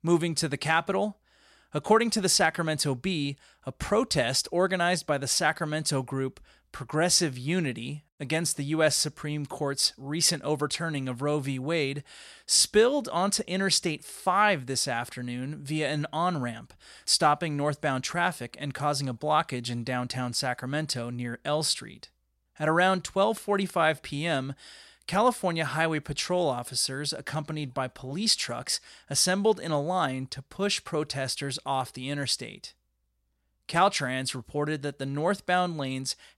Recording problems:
none

